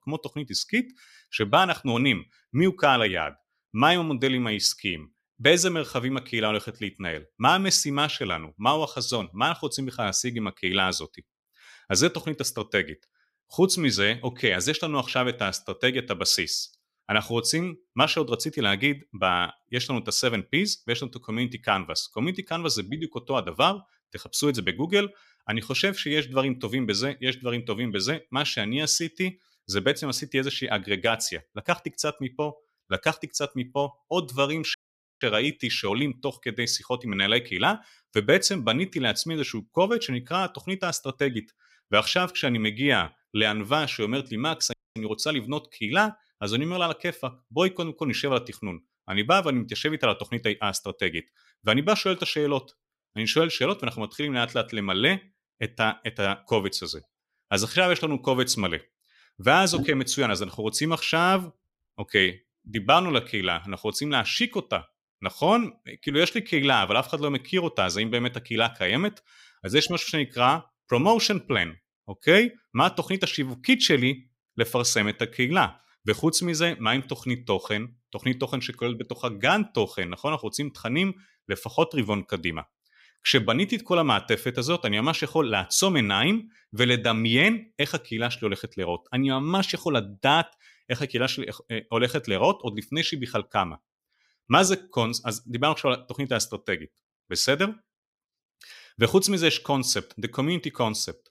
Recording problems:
audio cutting out; at 35 s and at 45 s

